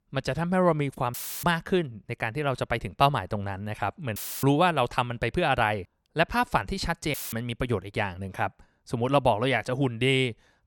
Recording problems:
audio cutting out; filled with static; at 1 s, at 4 s and at 7 s

